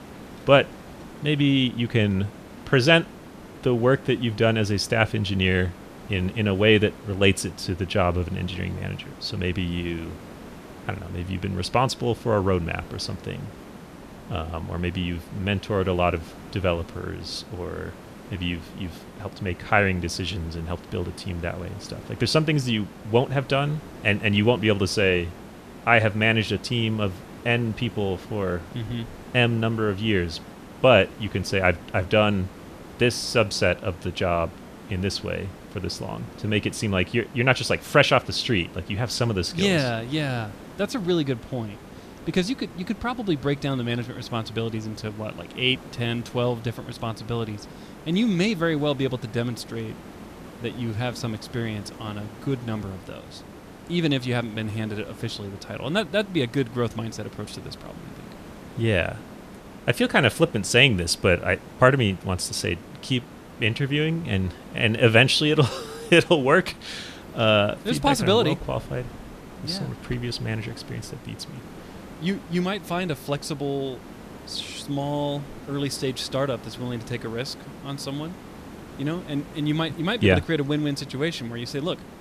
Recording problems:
hiss; noticeable; throughout; 20 dB below the speech

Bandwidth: 14.5 kHz